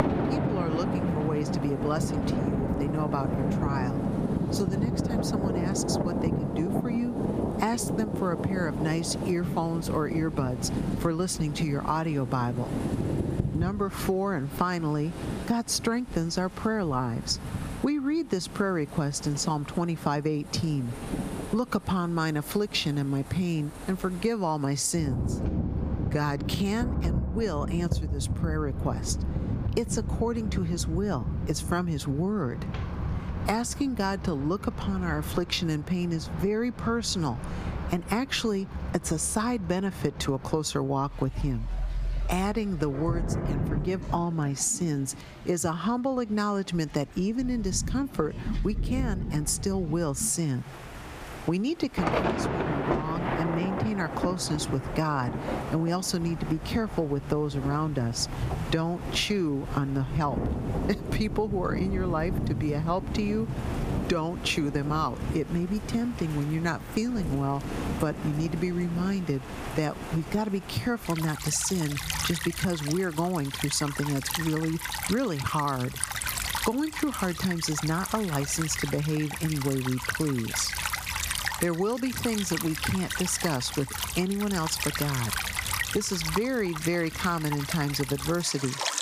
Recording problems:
squashed, flat; somewhat, background pumping
rain or running water; loud; throughout; 4 dB below the speech

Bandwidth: 15 kHz